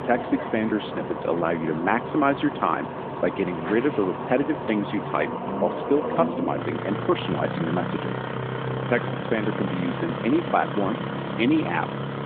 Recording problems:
phone-call audio
traffic noise; loud; throughout; 4 dB below the speech

